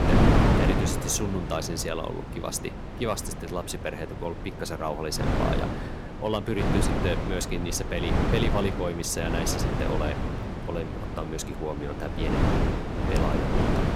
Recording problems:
wind noise on the microphone; heavy; as loud as the speech

